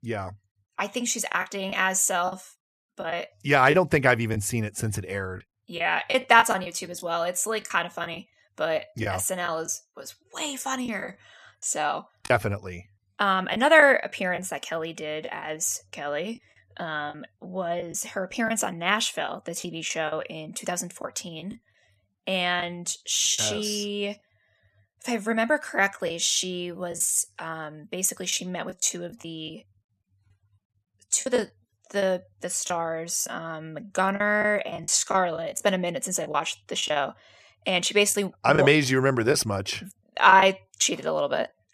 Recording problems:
choppy; very; 6% of the speech affected

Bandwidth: 14 kHz